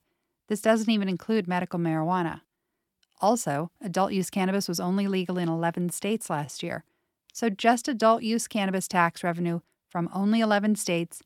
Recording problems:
none

